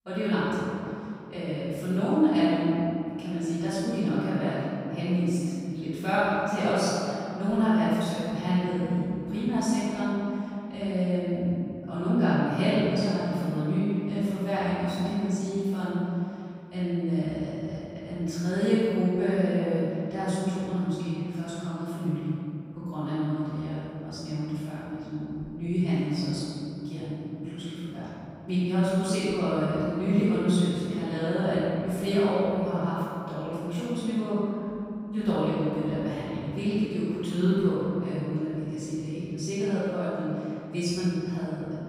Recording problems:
room echo; strong; dies away in 2.8 s
off-mic speech; far

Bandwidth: 15.5 kHz